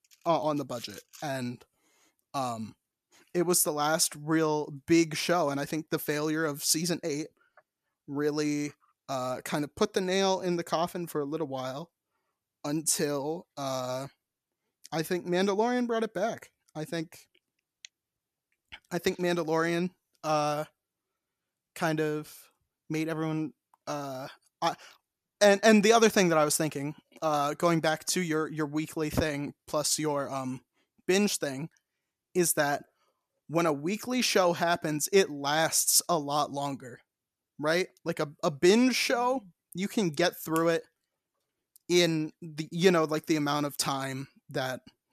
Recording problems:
none

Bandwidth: 14.5 kHz